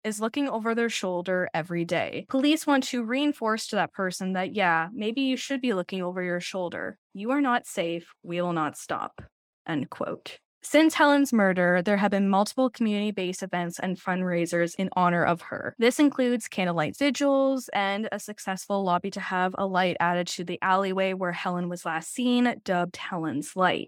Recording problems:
none

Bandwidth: 18 kHz